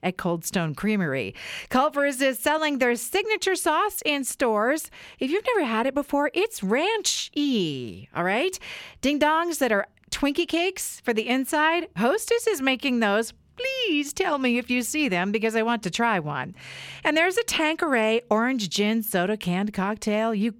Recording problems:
none

